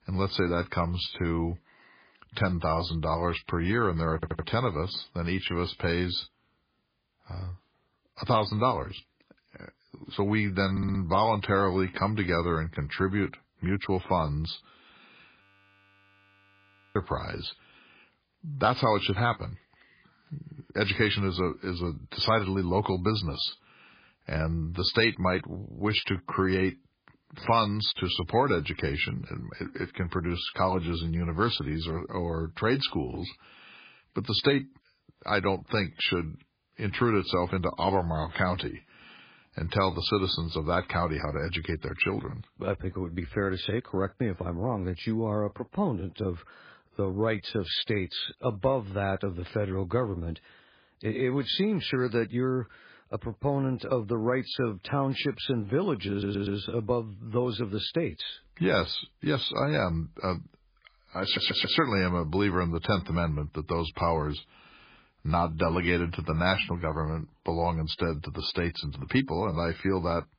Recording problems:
garbled, watery; badly
audio stuttering; 4 times, first at 4 s
audio freezing; at 15 s for 1.5 s

